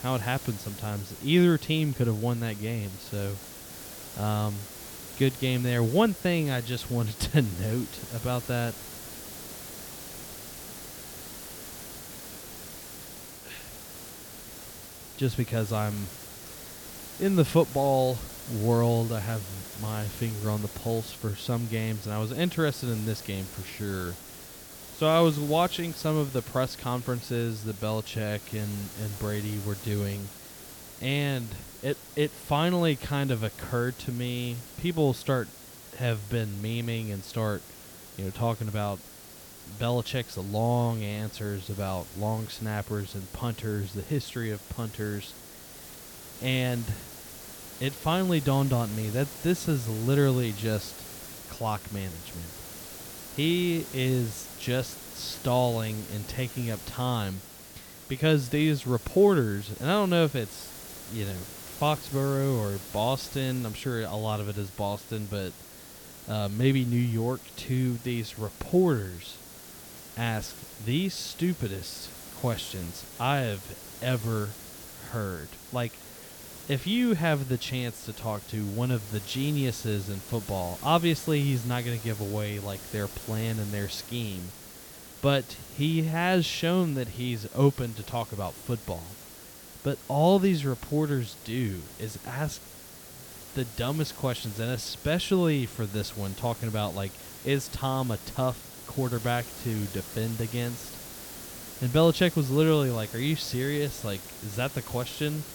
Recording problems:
hiss; noticeable; throughout; 15 dB below the speech

